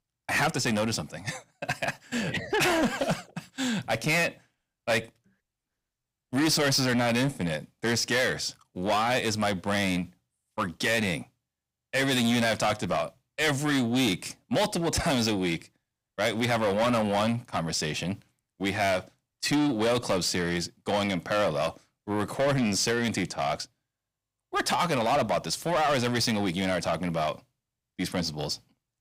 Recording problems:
distortion; heavy; 6 dB below the speech

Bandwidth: 15.5 kHz